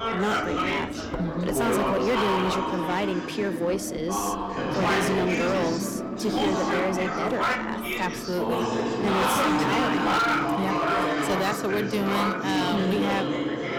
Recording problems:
distortion; slight; 13% of the sound clipped
chatter from many people; very loud; throughout; 2 dB above the speech
household noises; noticeable; throughout; 15 dB below the speech
train or aircraft noise; faint; throughout; 25 dB below the speech

